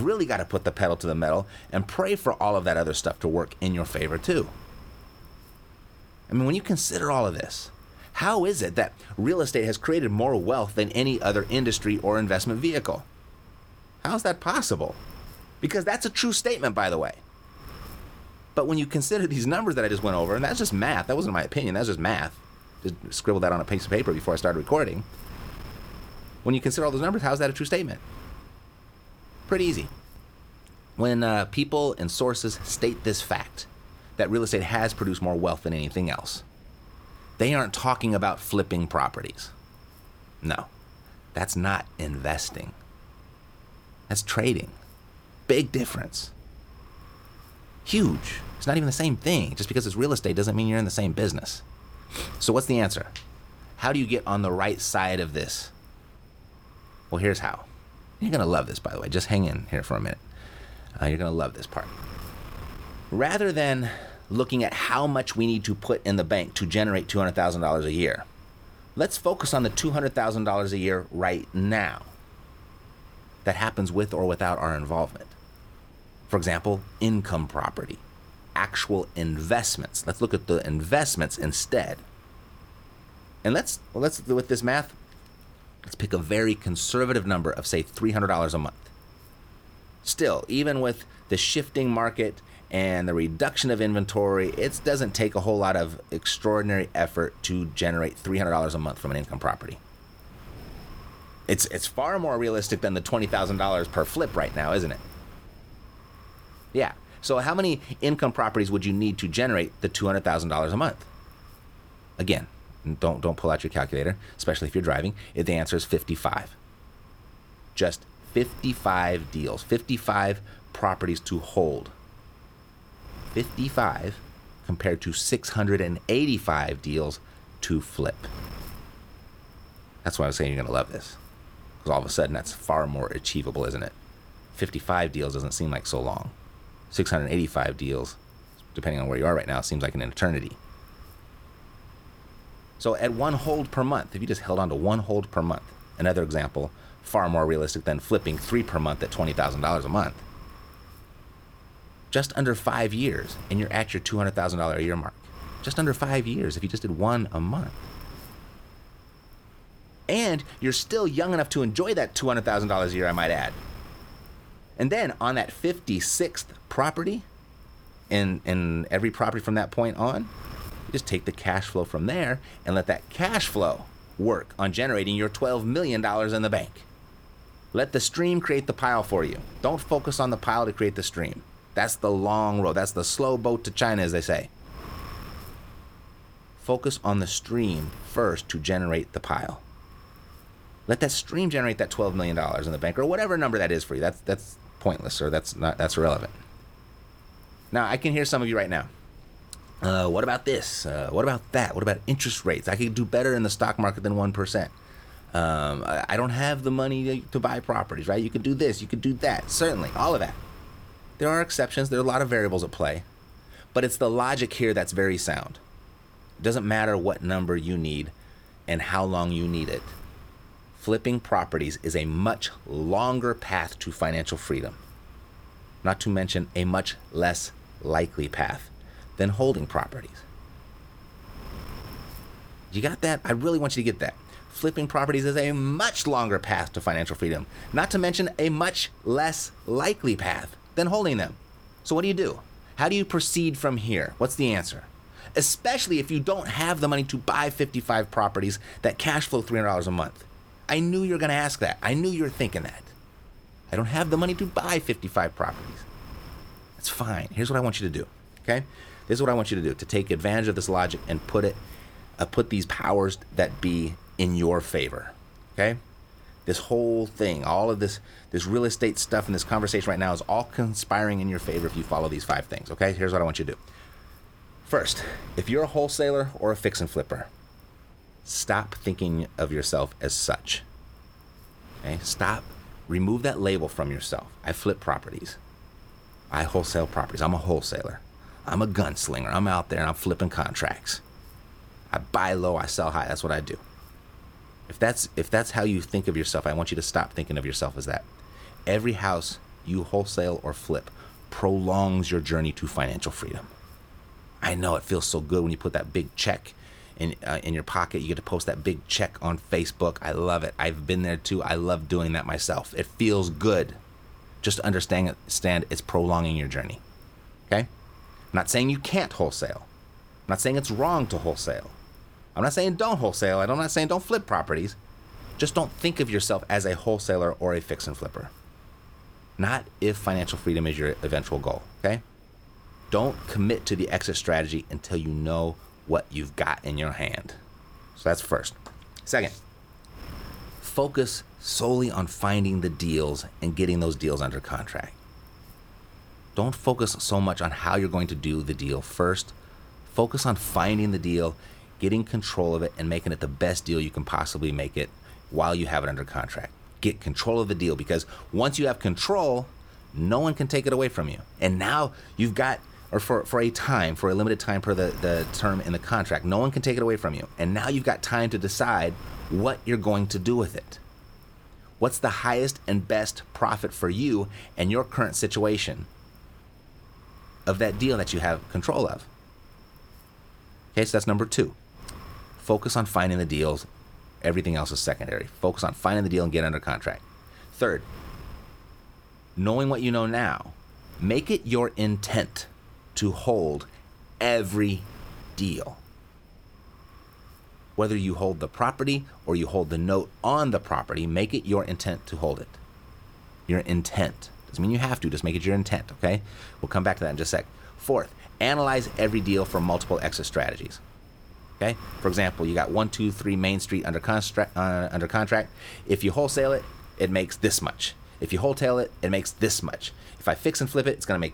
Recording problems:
wind noise on the microphone; occasional gusts; 25 dB below the speech
abrupt cut into speech; at the start

